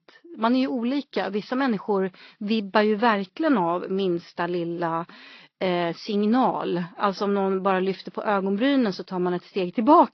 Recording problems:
garbled, watery; slightly; nothing above 5.5 kHz
high frequencies cut off; slight

